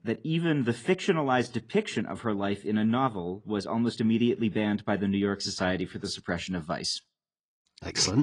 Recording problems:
garbled, watery; slightly
abrupt cut into speech; at the end

